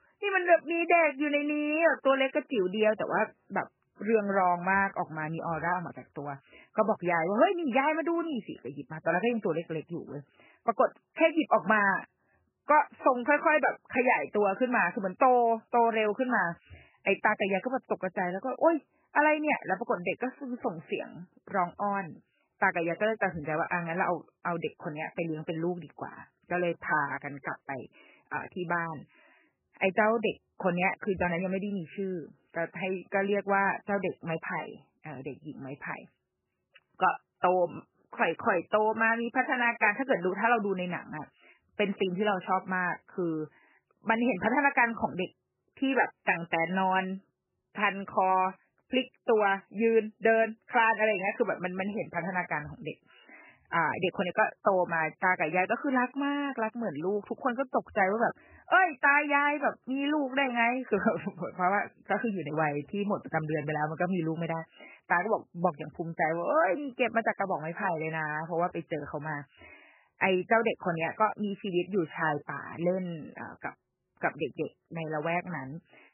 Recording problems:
garbled, watery; badly; nothing above 3 kHz

